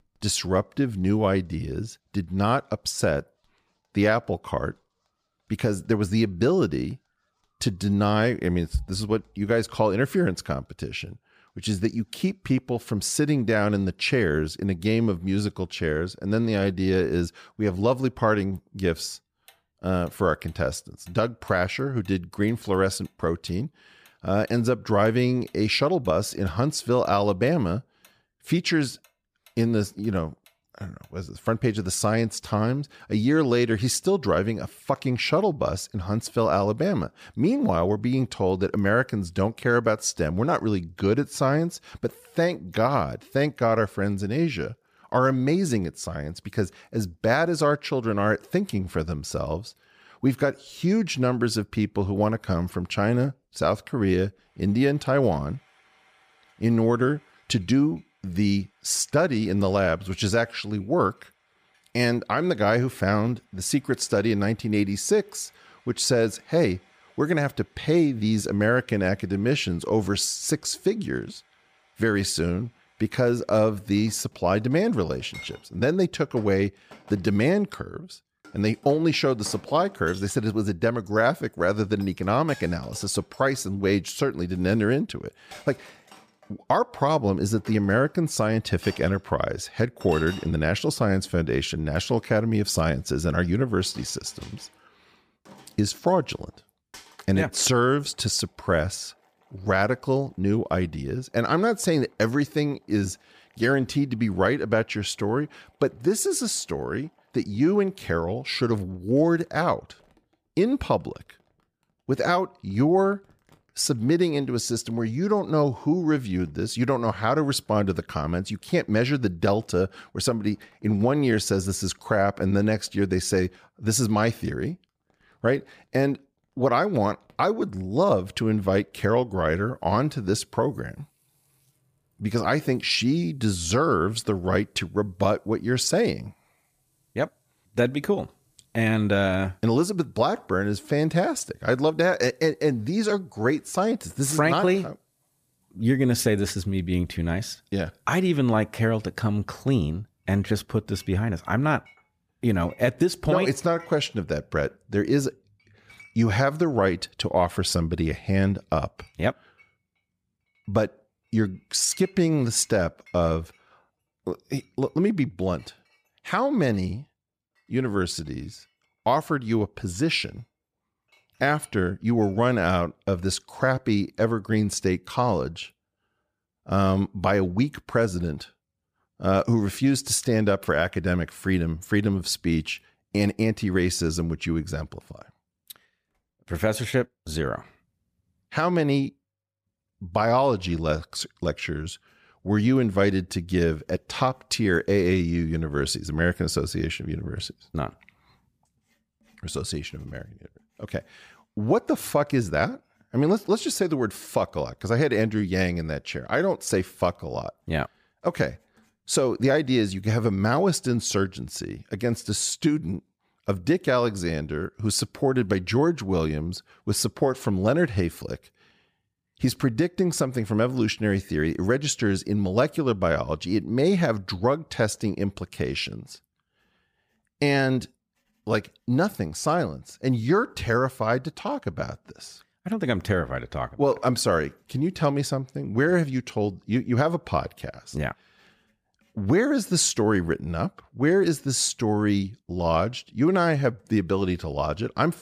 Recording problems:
household noises; faint; throughout; 30 dB below the speech

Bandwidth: 15 kHz